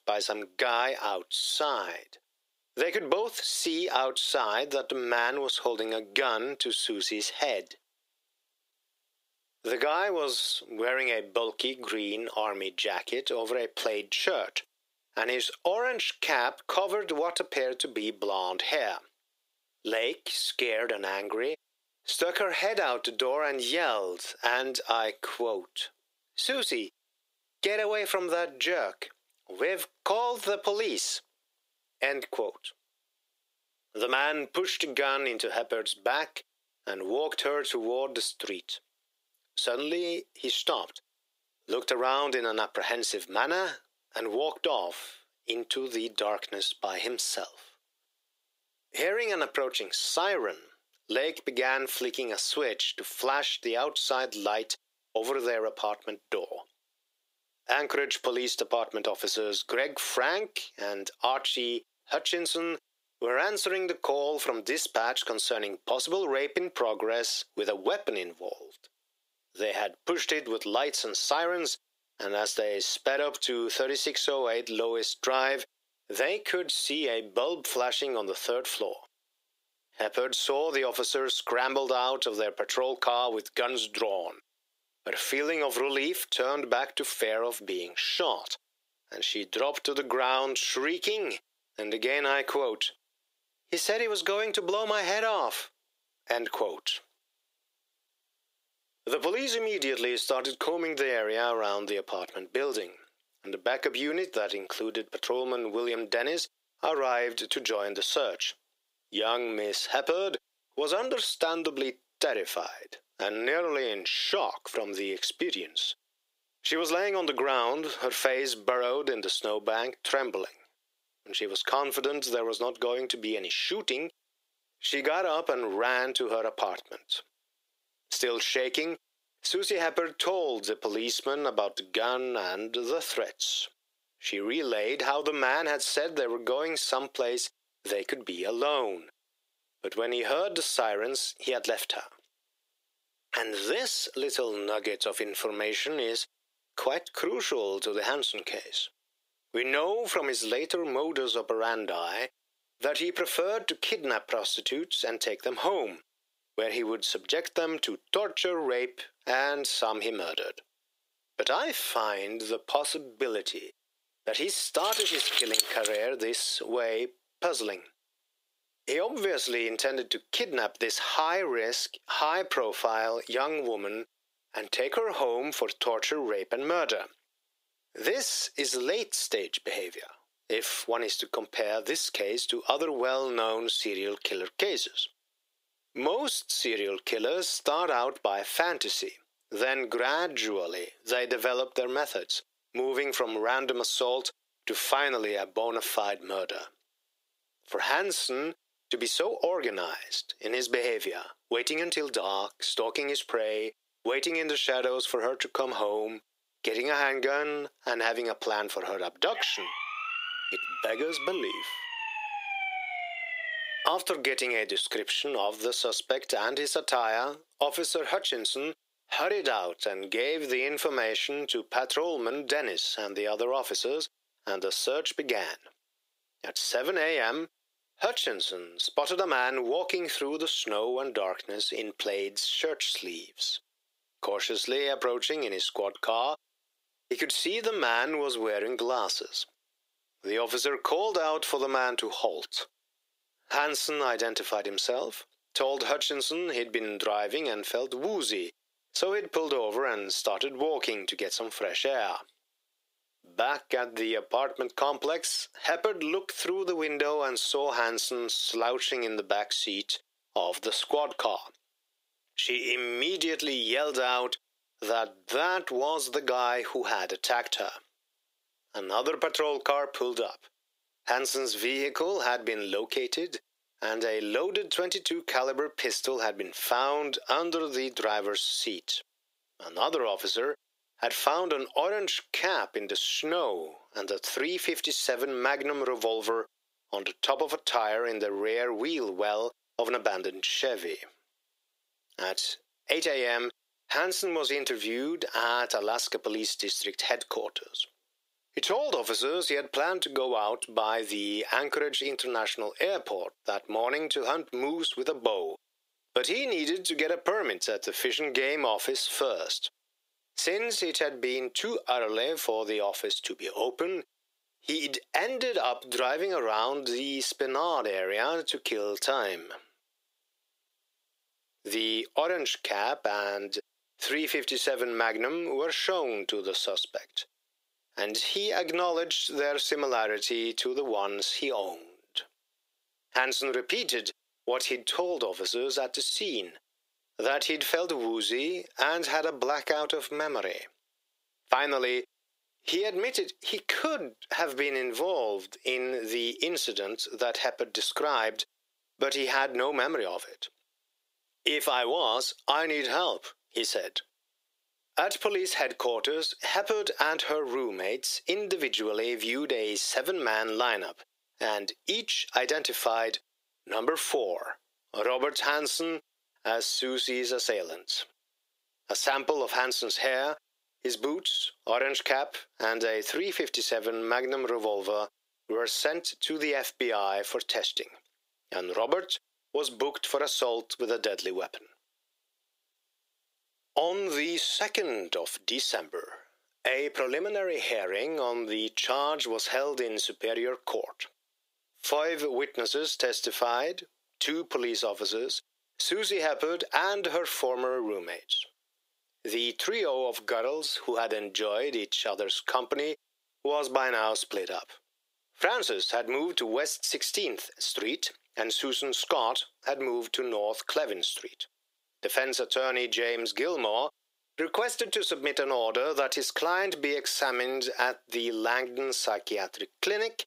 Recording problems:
thin; very; fading below 400 Hz
squashed, flat; heavily
jangling keys; loud; from 2:45 to 2:46; peak 5 dB above the speech
siren; noticeable; from 3:29 to 3:34; peak 2 dB below the speech

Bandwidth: 15.5 kHz